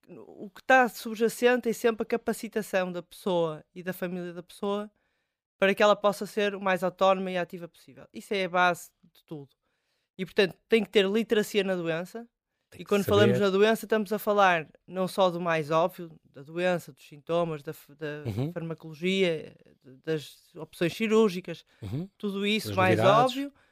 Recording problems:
none

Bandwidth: 15 kHz